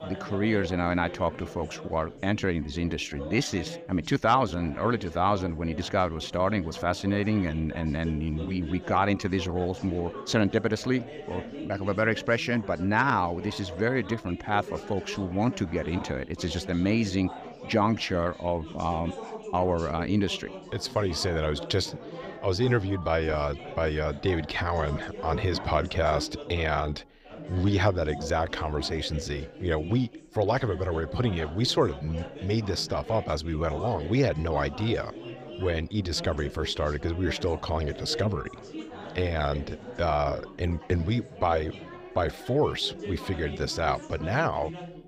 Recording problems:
chatter from many people; noticeable; throughout; 15 dB below the speech

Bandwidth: 15.5 kHz